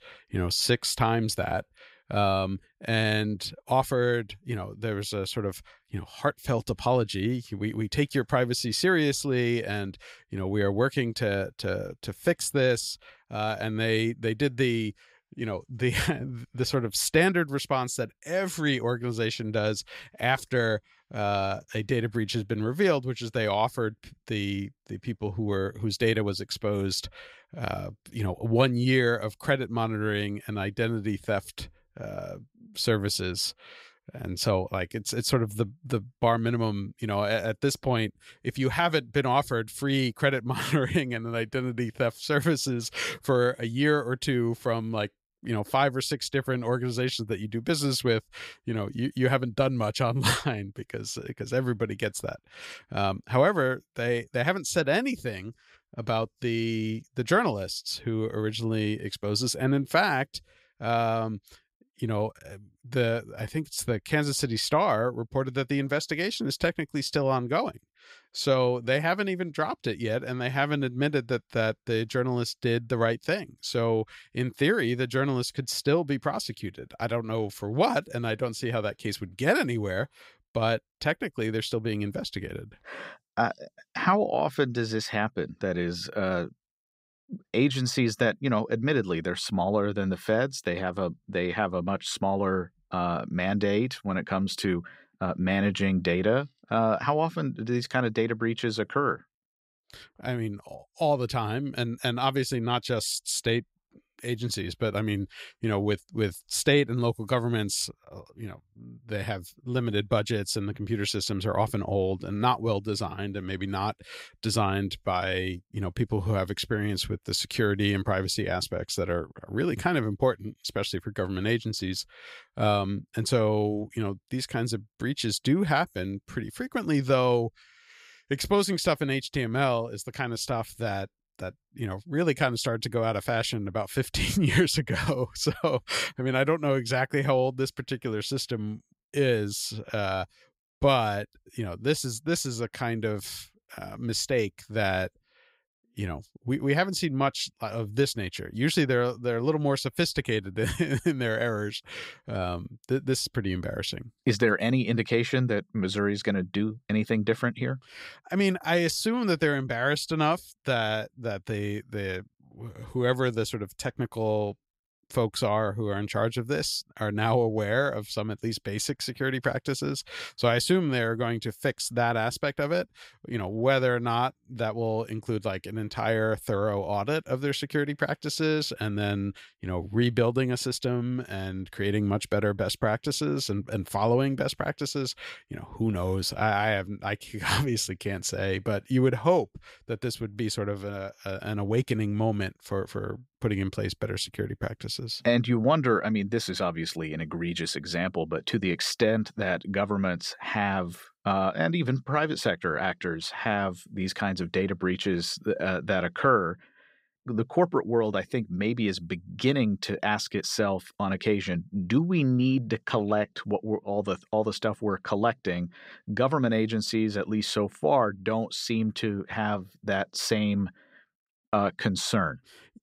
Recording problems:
none

